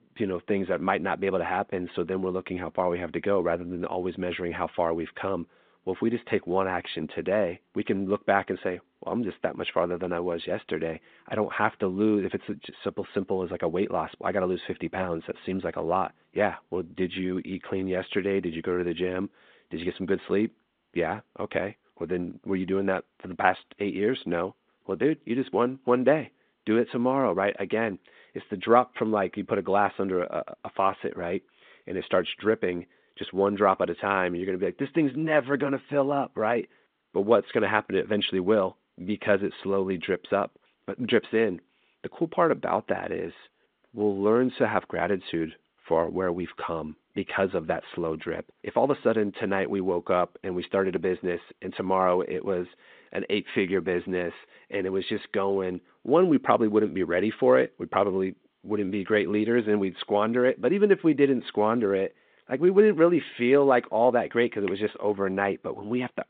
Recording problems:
phone-call audio; nothing above 3.5 kHz

